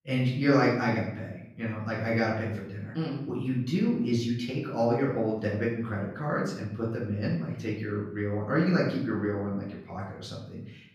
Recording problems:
off-mic speech; far
room echo; noticeable; dies away in 0.7 s

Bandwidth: 15.5 kHz